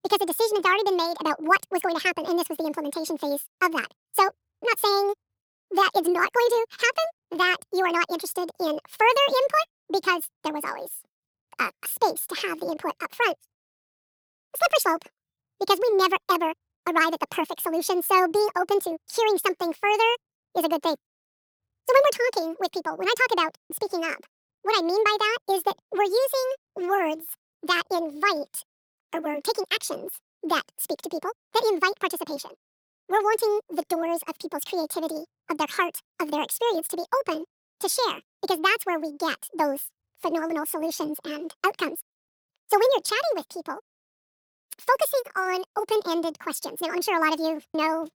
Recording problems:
wrong speed and pitch; too fast and too high; 1.7 times normal speed

